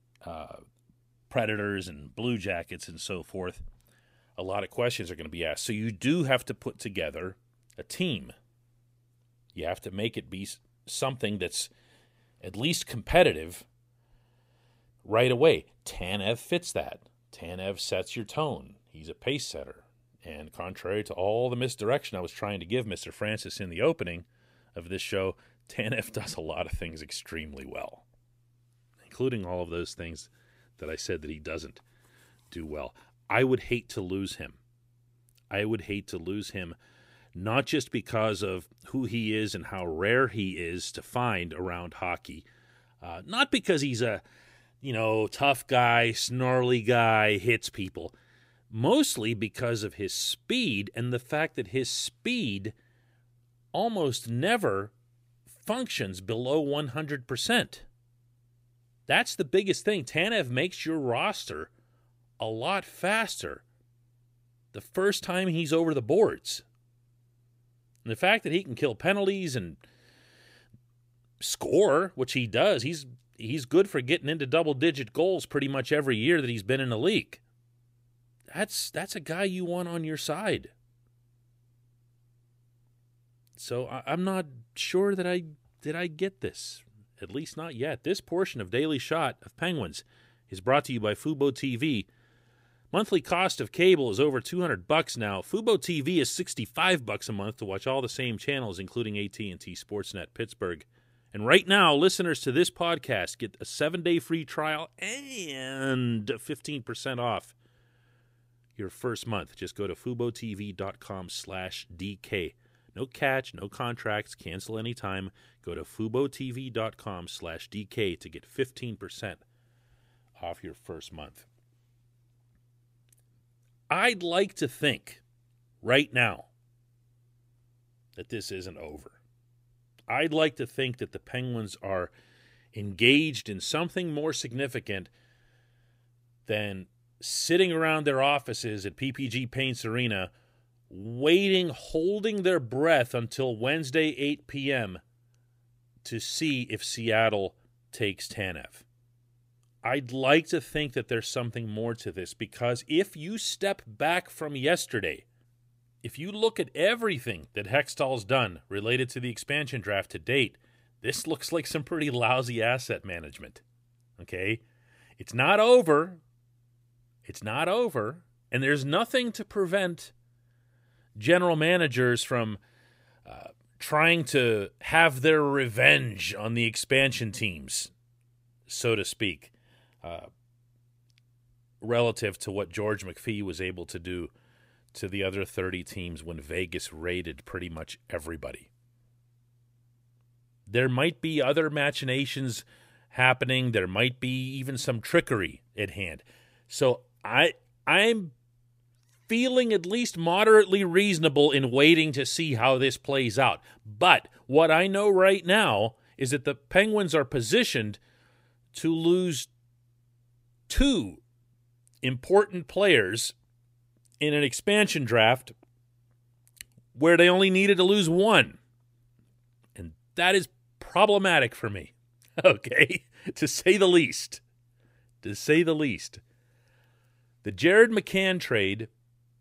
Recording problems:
none

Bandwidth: 15.5 kHz